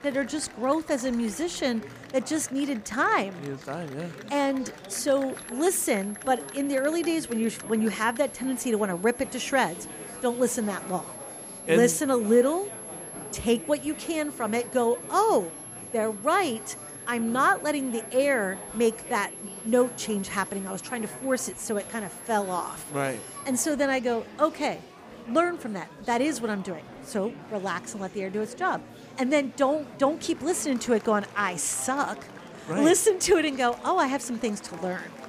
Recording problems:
high-pitched whine; noticeable; from 5.5 to 24 s; 11 kHz, 15 dB below the speech
murmuring crowd; noticeable; throughout; 15 dB below the speech

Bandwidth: 15 kHz